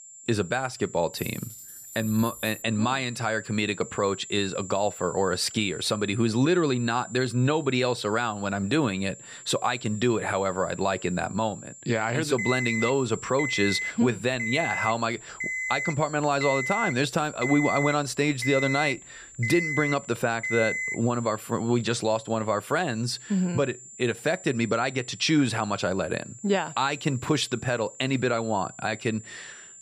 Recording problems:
high-pitched whine; noticeable; throughout; 7 kHz, 15 dB below the speech
jangling keys; faint; from 1 to 2.5 s; peak 15 dB below the speech
alarm; noticeable; from 12 to 21 s; peak 1 dB below the speech

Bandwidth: 14.5 kHz